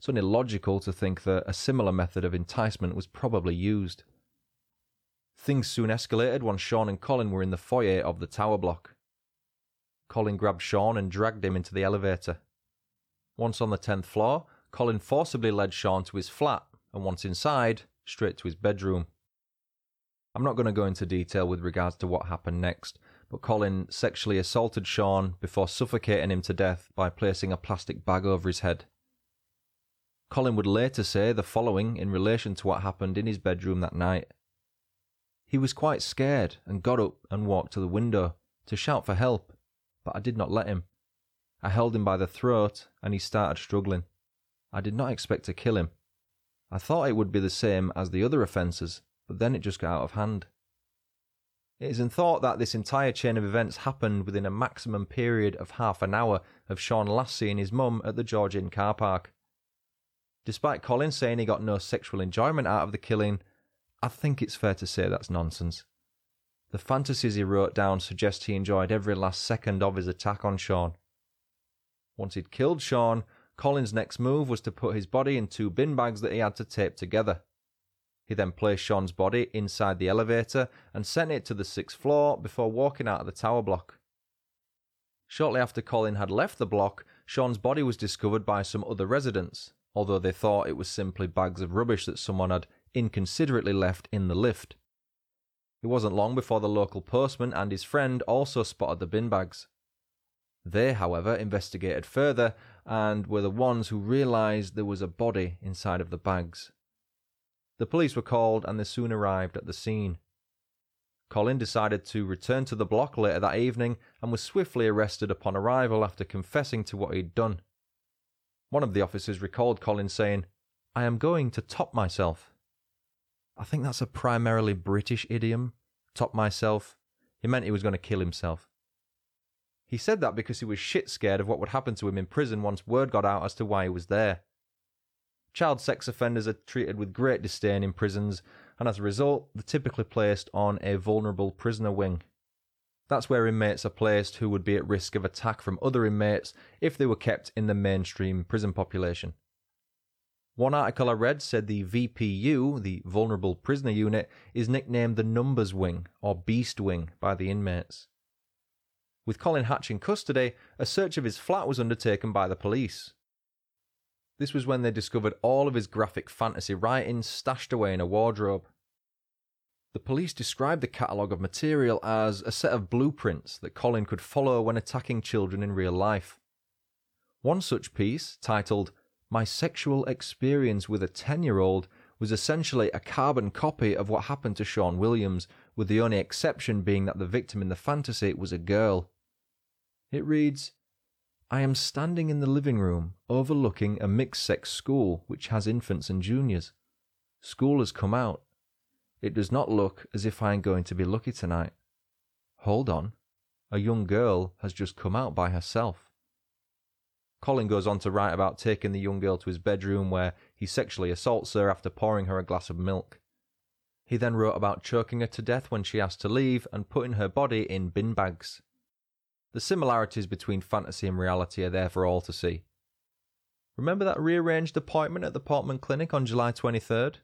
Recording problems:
none

